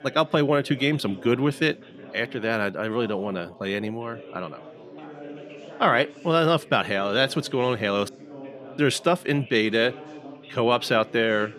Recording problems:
background chatter; noticeable; throughout; 4 voices, 20 dB below the speech

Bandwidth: 13.5 kHz